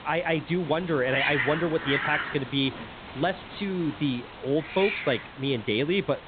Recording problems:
high frequencies cut off; severe; nothing above 4 kHz
hiss; loud; throughout; 5 dB below the speech

